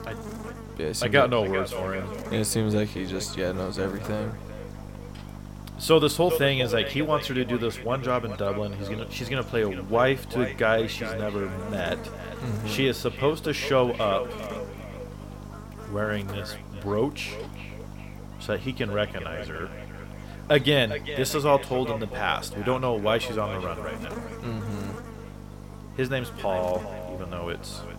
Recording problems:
echo of what is said; strong; throughout; 400 ms later, 10 dB below the speech
electrical hum; noticeable; throughout; 50 Hz, 15 dB below the speech

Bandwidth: 16.5 kHz